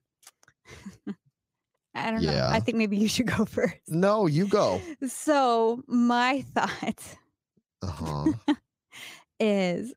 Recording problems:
uneven, jittery; strongly; from 2 to 8.5 s

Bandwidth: 15.5 kHz